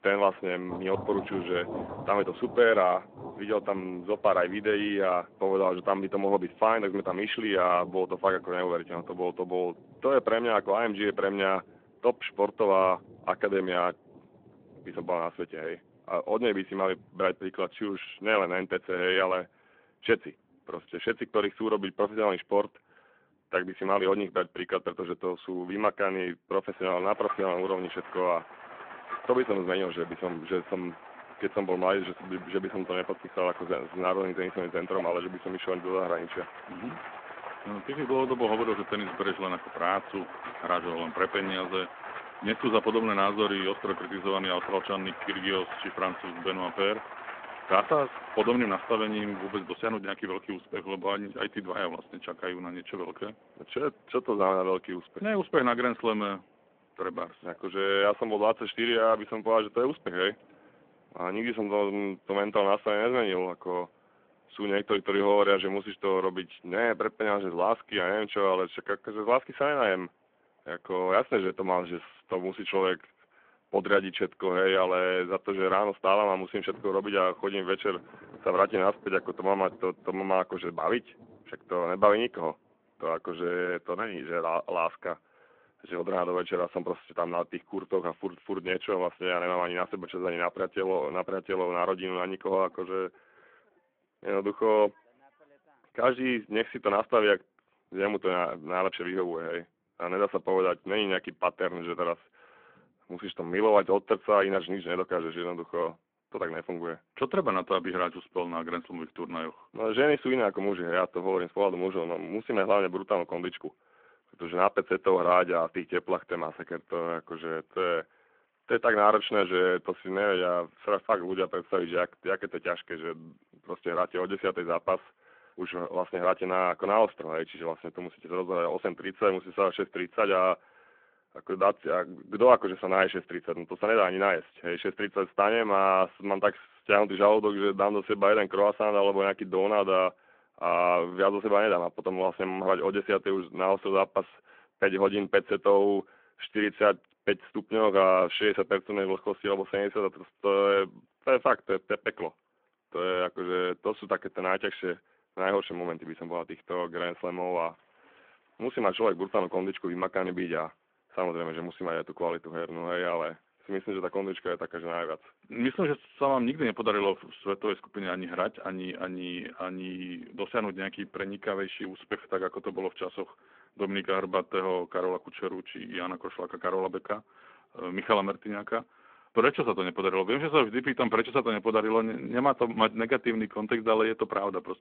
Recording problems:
phone-call audio
rain or running water; noticeable; throughout; 15 dB below the speech

